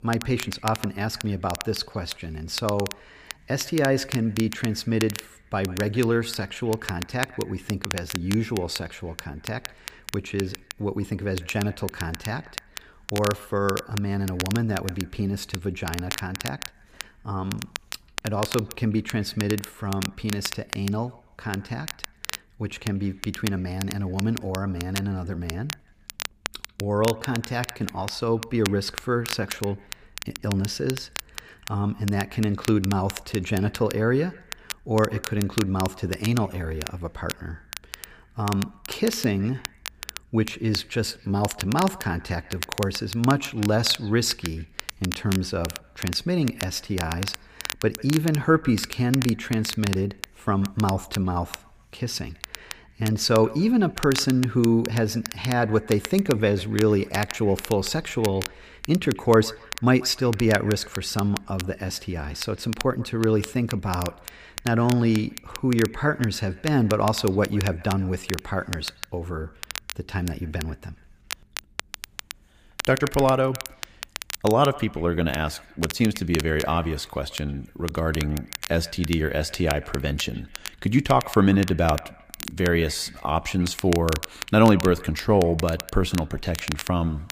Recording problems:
echo of what is said; faint; throughout; 140 ms later, 25 dB below the speech
crackle, like an old record; noticeable; 10 dB below the speech

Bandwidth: 15 kHz